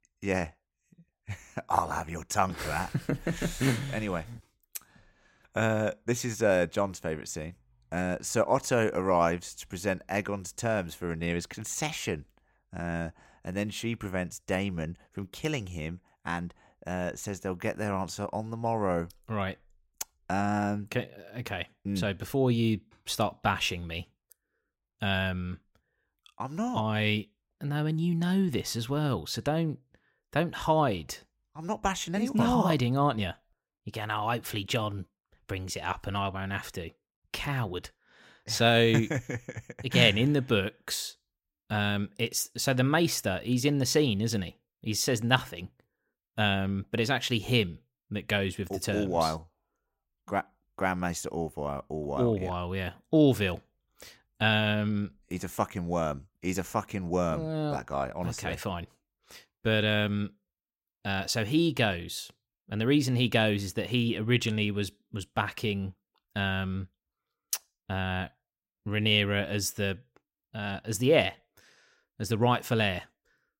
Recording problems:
none

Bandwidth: 16 kHz